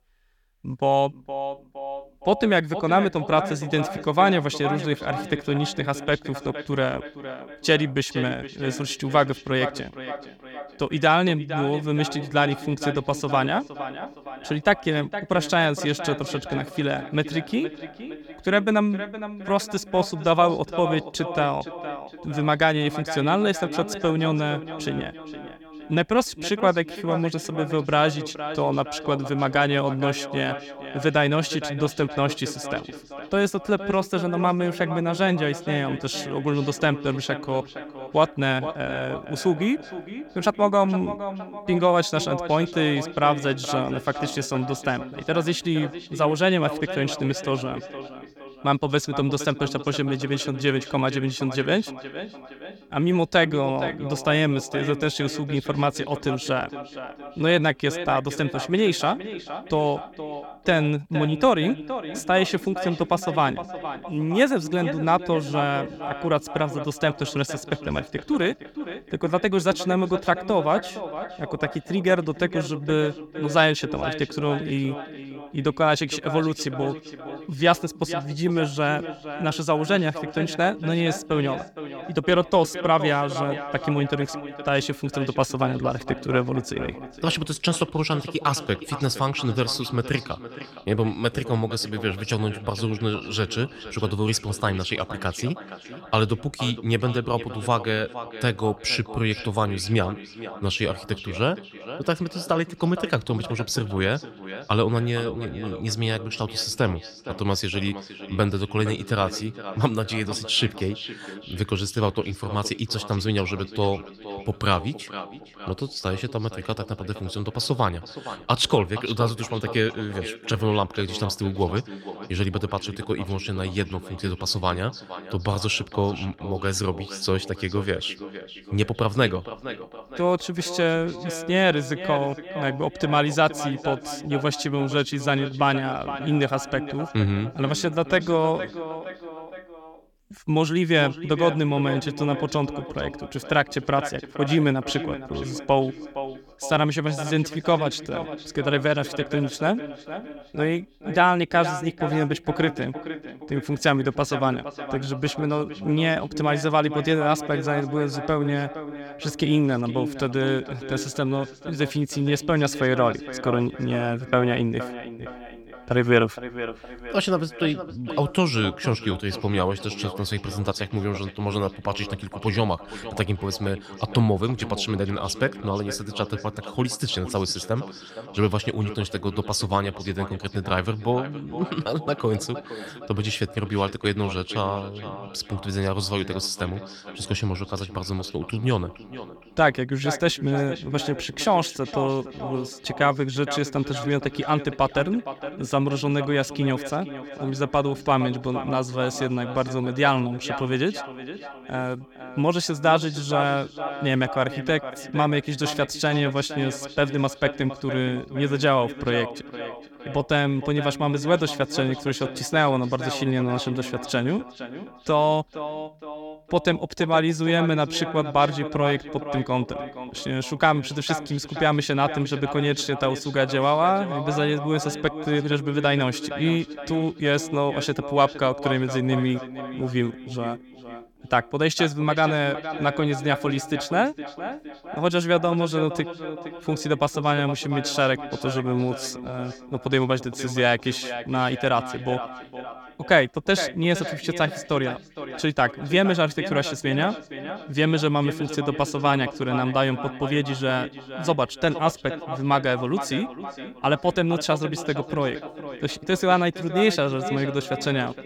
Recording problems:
echo of what is said; strong; throughout; 460 ms later, 10 dB below the speech

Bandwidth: 17.5 kHz